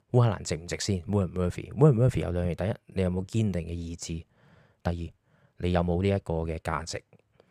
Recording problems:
uneven, jittery; strongly; from 3 to 7 s

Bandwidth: 15 kHz